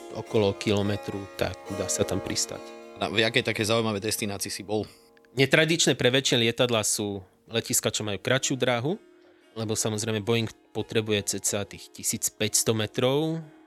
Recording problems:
background music; noticeable; throughout; 20 dB below the speech

